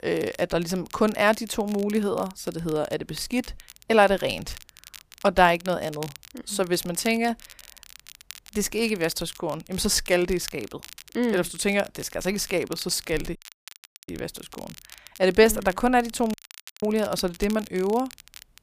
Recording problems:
crackle, like an old record; noticeable; 20 dB below the speech
audio cutting out; at 13 s for 0.5 s and at 16 s

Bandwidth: 15 kHz